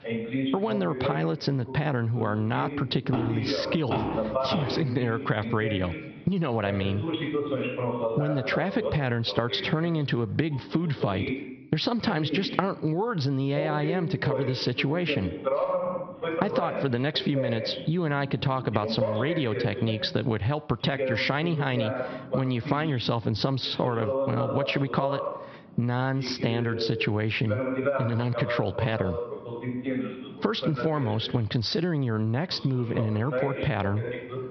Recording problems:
high frequencies cut off; noticeable; nothing above 5.5 kHz
squashed, flat; somewhat, background pumping
voice in the background; loud; throughout; 5 dB below the speech

